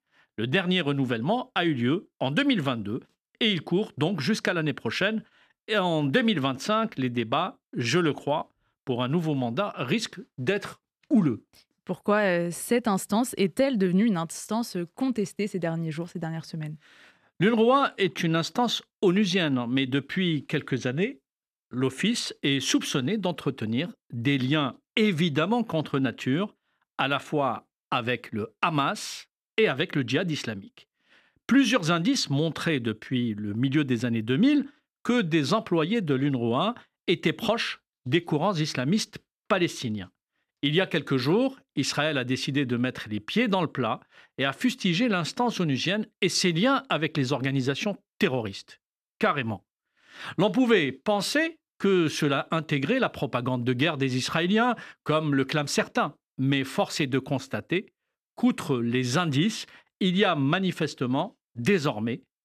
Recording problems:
none

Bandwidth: 14.5 kHz